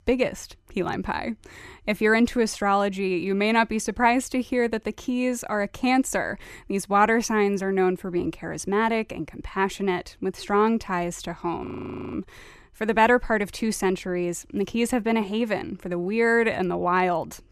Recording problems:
audio freezing; at 12 s

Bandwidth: 14.5 kHz